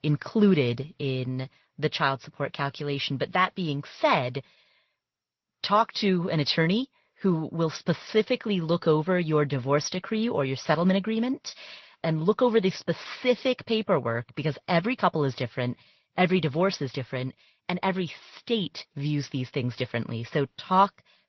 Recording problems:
garbled, watery; slightly; nothing above 6 kHz

